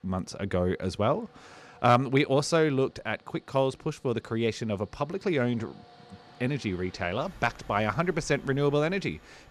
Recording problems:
train or aircraft noise; faint; throughout; 25 dB below the speech

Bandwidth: 14.5 kHz